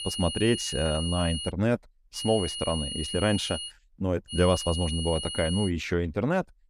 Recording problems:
high-pitched whine; loud; until 1.5 s, from 2 to 3.5 s and from 4.5 to 5.5 s; 3 kHz, 5 dB below the speech

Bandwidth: 14.5 kHz